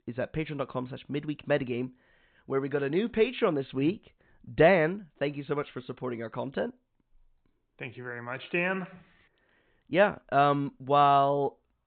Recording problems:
high frequencies cut off; severe; nothing above 4 kHz

